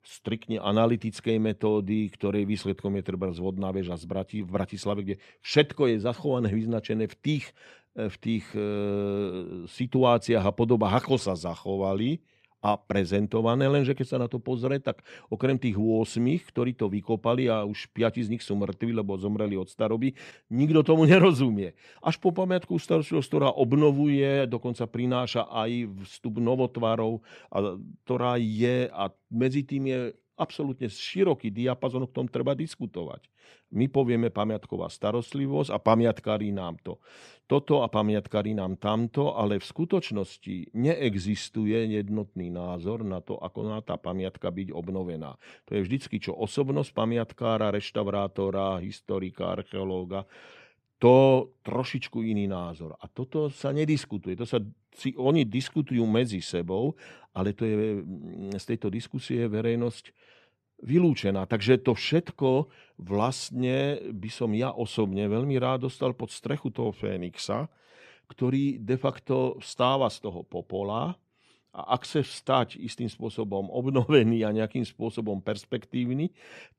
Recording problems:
none

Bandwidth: 13.5 kHz